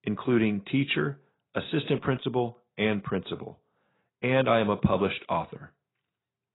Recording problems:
garbled, watery; badly; nothing above 4 kHz

